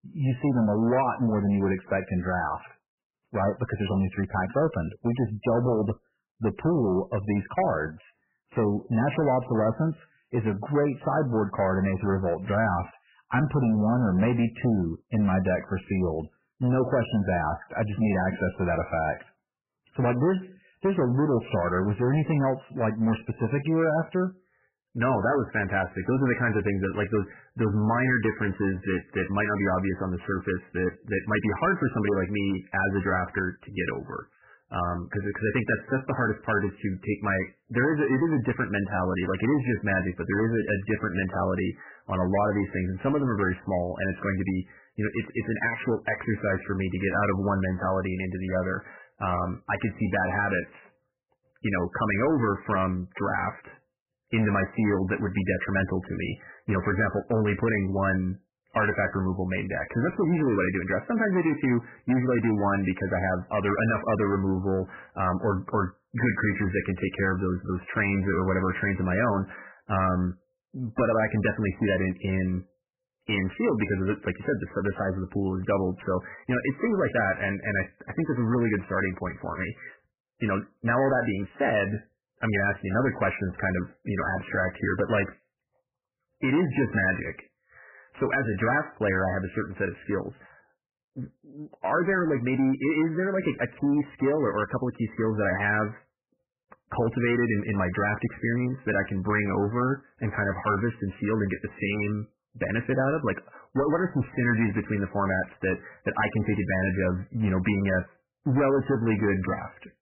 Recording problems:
garbled, watery; badly; nothing above 3 kHz
distortion; slight; 8% of the sound clipped

